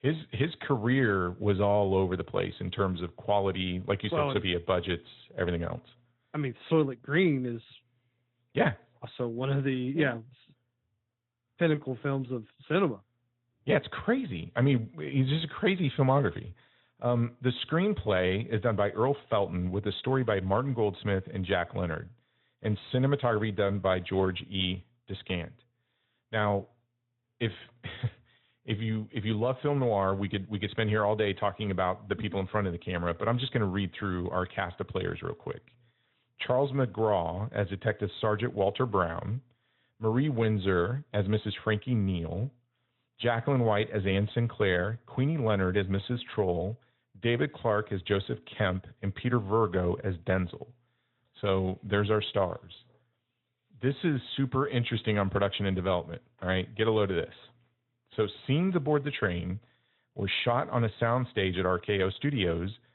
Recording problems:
high frequencies cut off; severe; nothing above 4 kHz
garbled, watery; slightly

